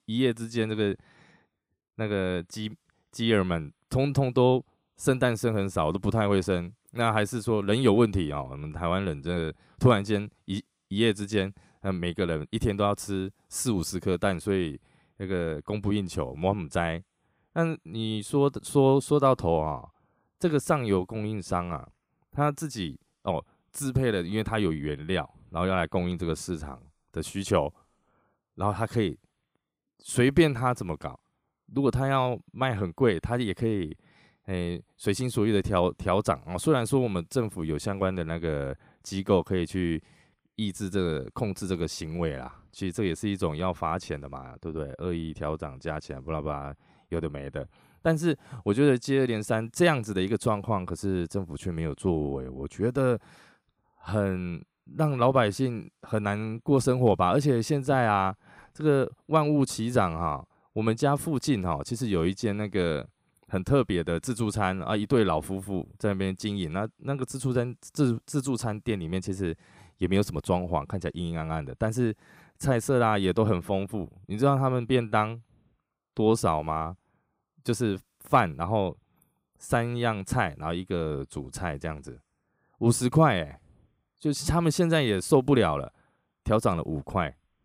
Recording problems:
none

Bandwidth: 15.5 kHz